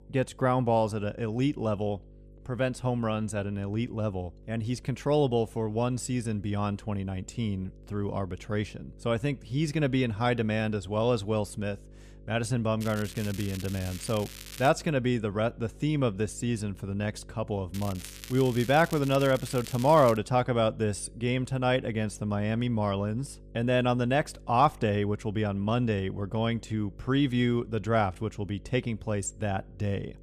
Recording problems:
crackling; noticeable; from 13 to 15 s and from 18 to 20 s; 15 dB below the speech
electrical hum; faint; throughout; 50 Hz, 30 dB below the speech

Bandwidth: 14.5 kHz